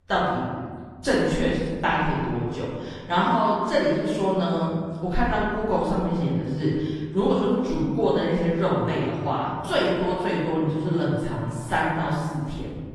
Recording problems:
room echo; strong; dies away in 1.5 s
off-mic speech; far
garbled, watery; slightly; nothing above 11 kHz

